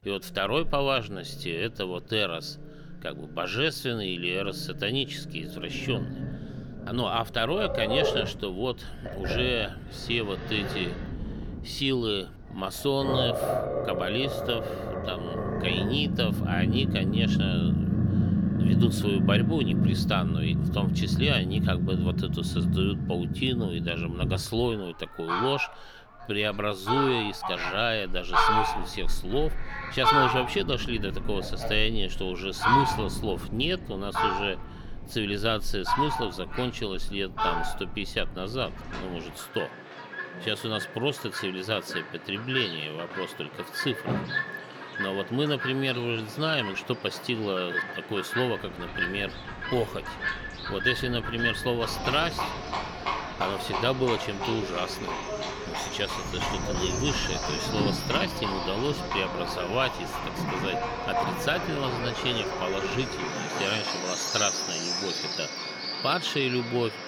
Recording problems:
animal sounds; loud; throughout; as loud as the speech
wind noise on the microphone; occasional gusts; from 5.5 to 20 s, from 29 to 39 s and from 49 s to 1:03; 20 dB below the speech

